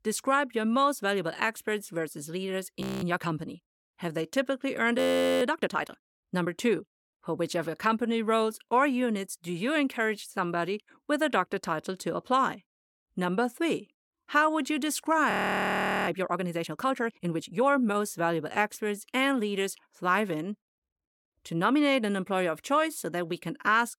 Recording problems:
audio freezing; at 3 s, at 5 s and at 15 s for 1 s

